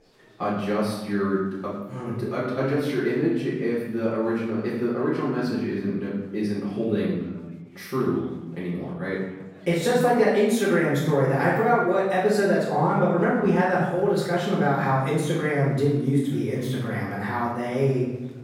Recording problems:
off-mic speech; far
room echo; noticeable; dies away in 0.9 s
chatter from many people; faint; throughout; 30 dB below the speech

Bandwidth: 16.5 kHz